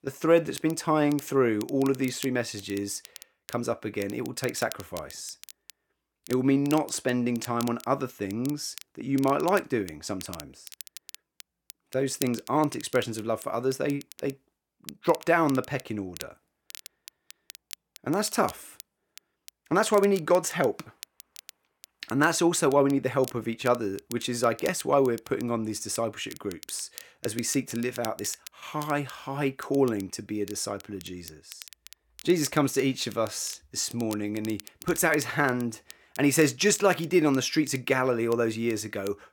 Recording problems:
crackle, like an old record; noticeable; 20 dB below the speech

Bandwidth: 17.5 kHz